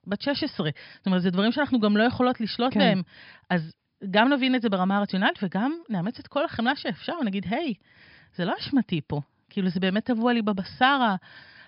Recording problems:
high frequencies cut off; noticeable; nothing above 5.5 kHz

